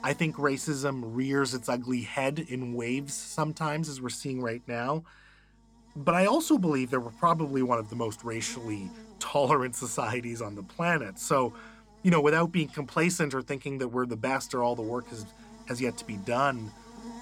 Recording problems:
electrical hum; faint; throughout; 50 Hz, 25 dB below the speech

